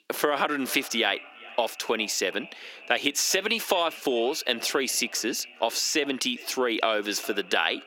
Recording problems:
echo of what is said; noticeable; throughout; 410 ms later, 20 dB below the speech
thin; very slightly; fading below 300 Hz
squashed, flat; somewhat

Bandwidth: 16.5 kHz